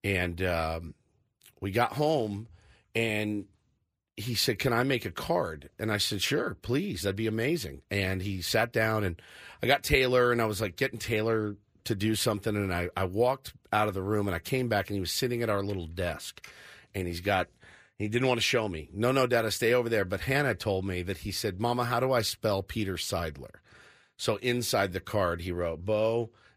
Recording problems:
none

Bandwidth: 15 kHz